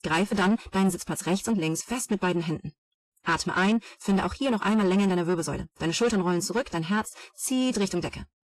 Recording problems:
wrong speed, natural pitch; too fast; 1.5 times normal speed
distortion; slight; 10 dB below the speech
garbled, watery; slightly; nothing above 12 kHz

